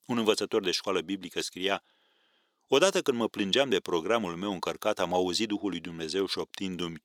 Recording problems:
thin; somewhat; fading below 350 Hz

